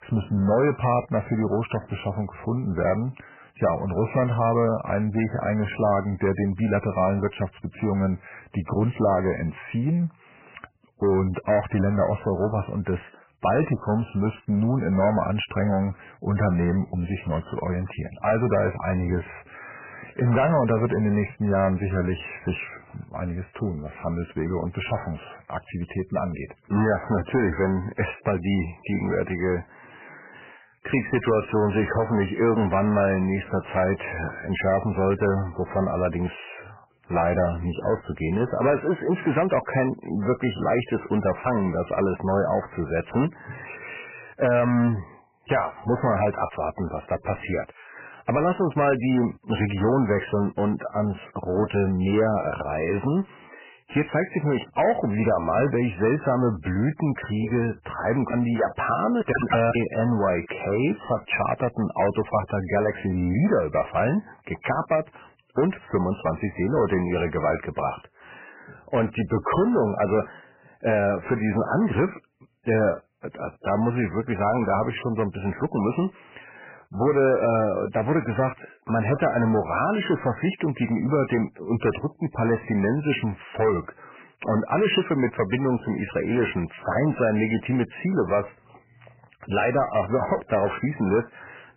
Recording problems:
garbled, watery; badly; nothing above 3 kHz
distortion; slight; 10 dB below the speech

